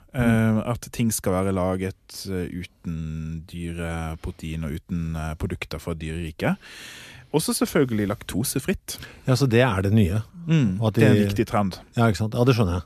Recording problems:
none

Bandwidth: 14 kHz